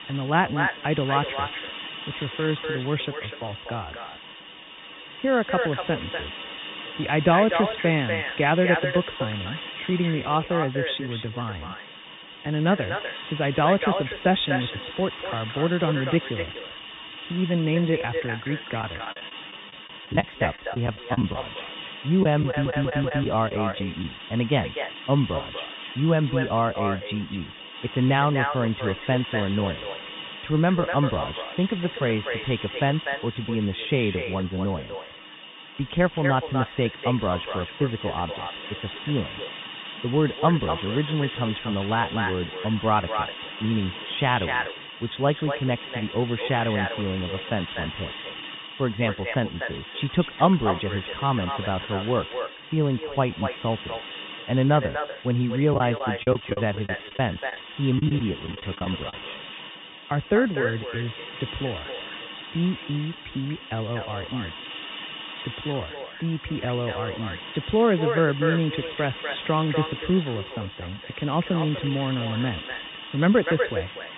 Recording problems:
echo of what is said; strong; throughout; 250 ms later, 7 dB below the speech
high frequencies cut off; severe; nothing above 3.5 kHz
hiss; noticeable; throughout; 10 dB below the speech
choppy; very; from 19 to 21 s, from 22 to 24 s and from 56 to 59 s; 13% of the speech affected
audio stuttering; at 22 s

